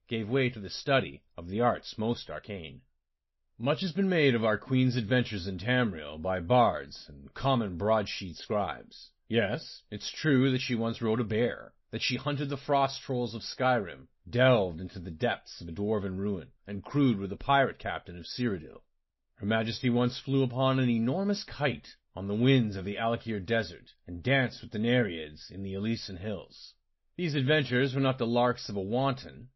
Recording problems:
garbled, watery; slightly; nothing above 5.5 kHz

